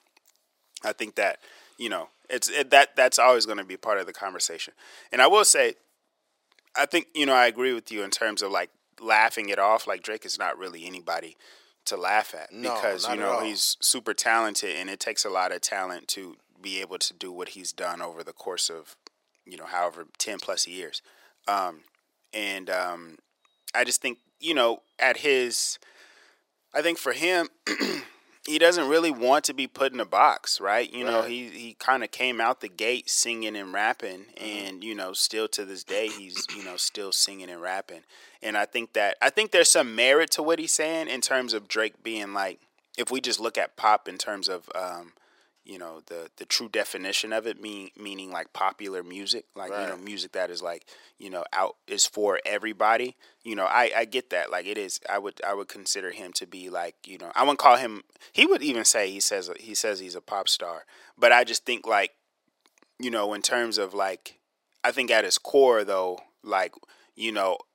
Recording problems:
thin; very; fading below 450 Hz

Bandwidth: 16 kHz